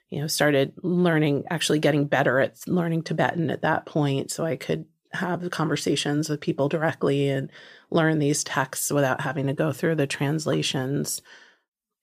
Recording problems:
none

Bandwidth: 15 kHz